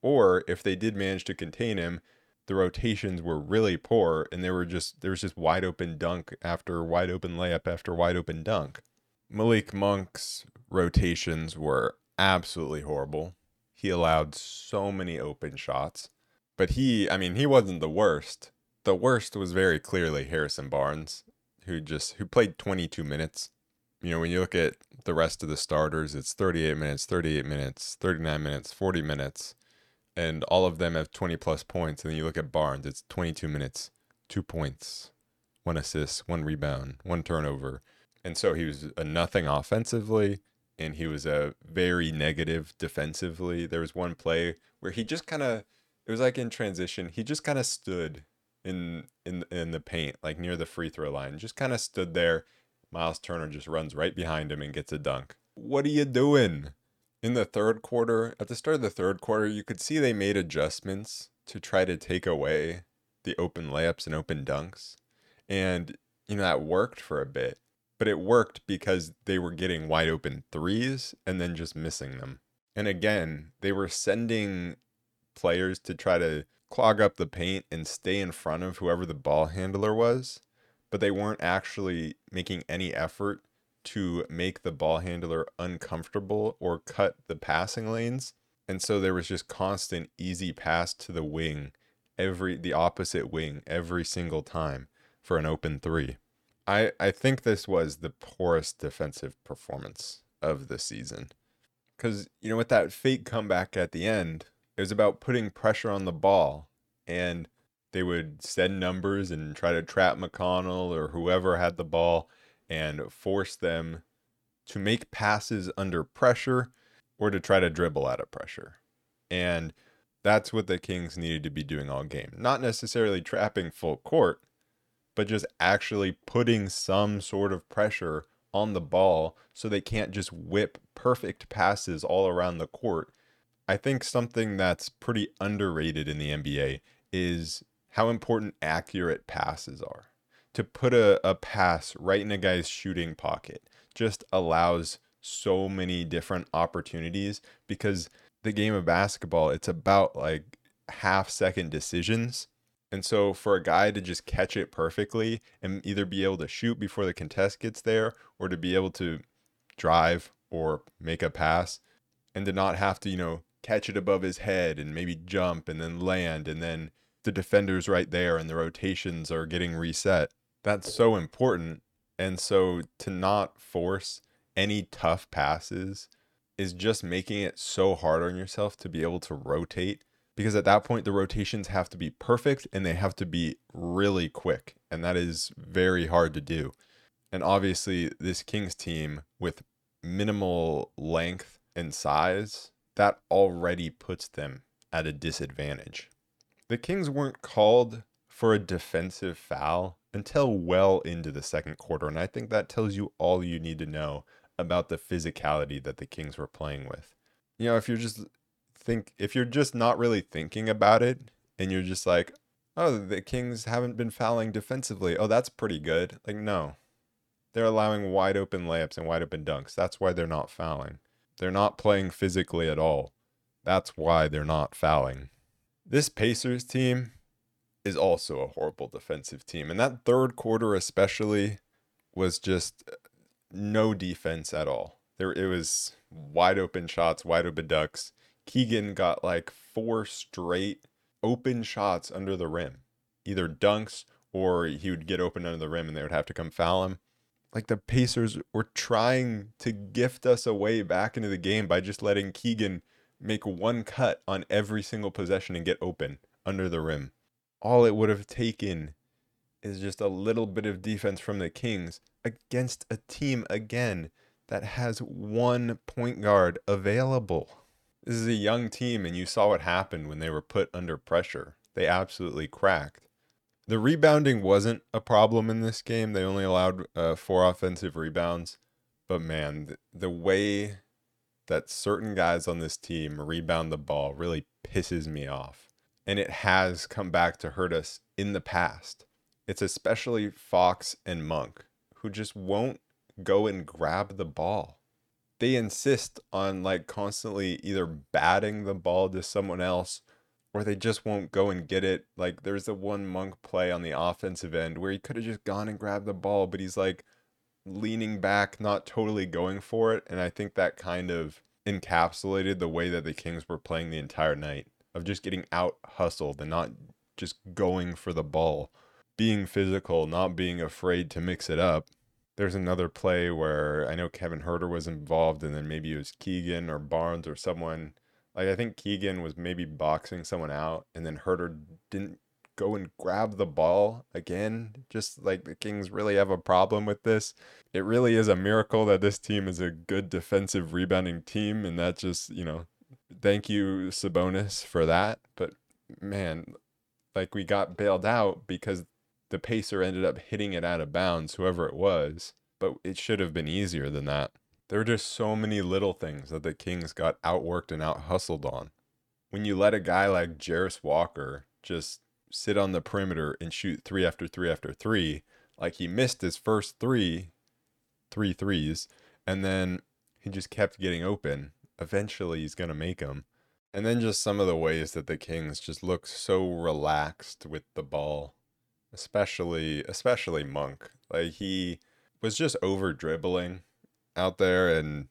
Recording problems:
none

